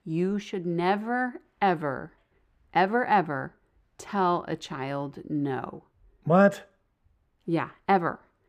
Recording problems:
muffled; slightly; fading above 3.5 kHz

